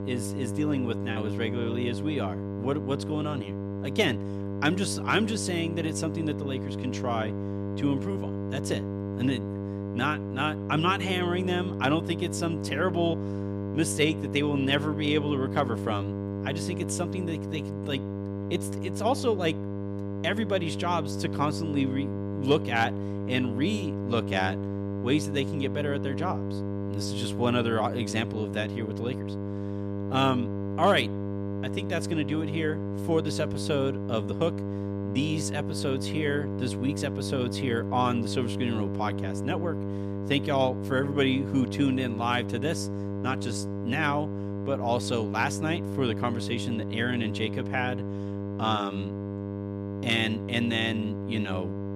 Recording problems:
electrical hum; loud; throughout; 50 Hz, 8 dB below the speech

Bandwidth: 14 kHz